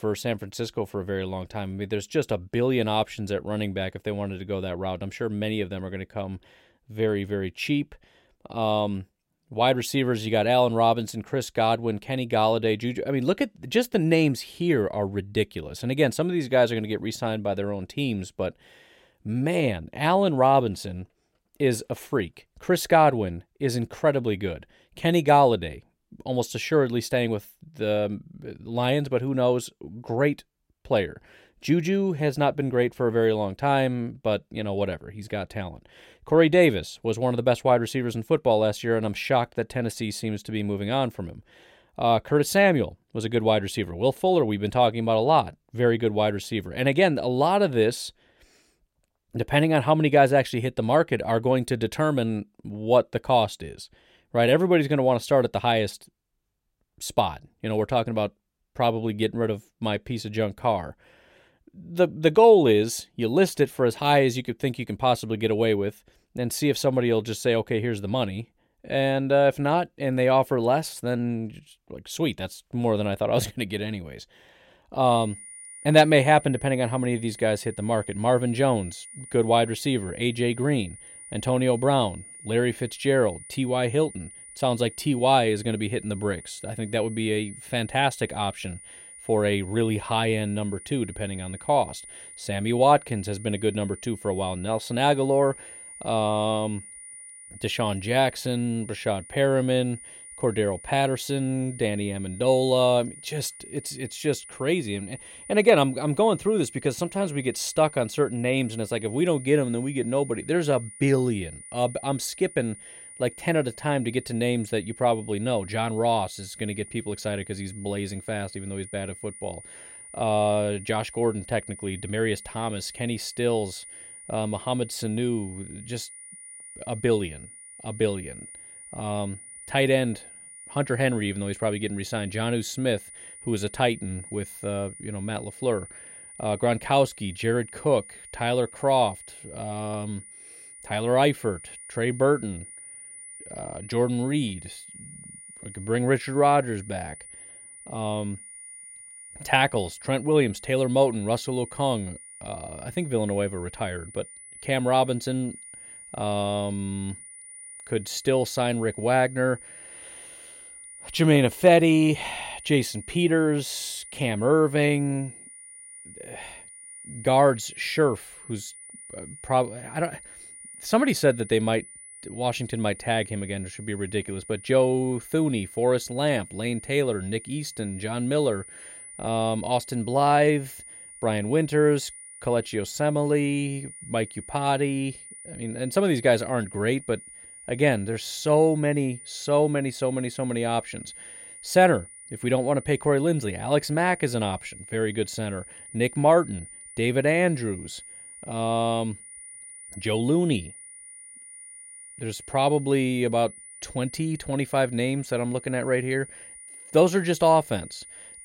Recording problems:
high-pitched whine; noticeable; from 1:15 on; 9.5 kHz, 15 dB below the speech

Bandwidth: 16 kHz